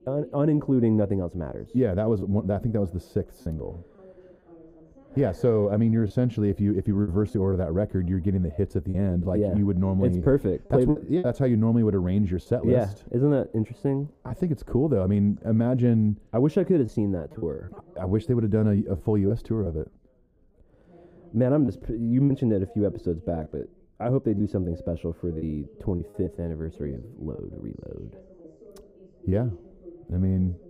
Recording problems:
muffled; very; fading above 1 kHz
background chatter; faint; throughout; 3 voices, 25 dB below the speech
choppy; occasionally; 4% of the speech affected

